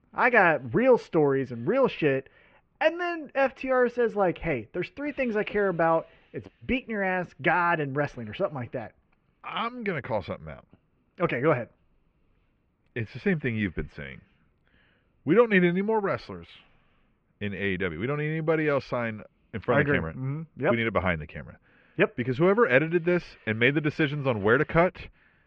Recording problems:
muffled; very; fading above 2.5 kHz

